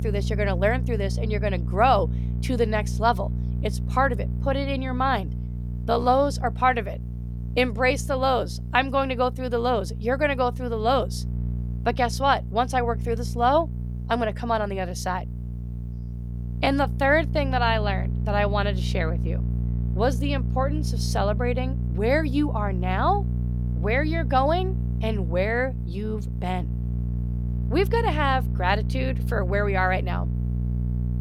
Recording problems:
electrical hum; noticeable; throughout; 60 Hz, 15 dB below the speech

